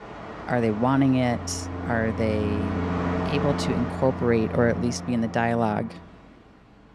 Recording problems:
train or aircraft noise; loud; throughout; 6 dB below the speech

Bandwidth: 13.5 kHz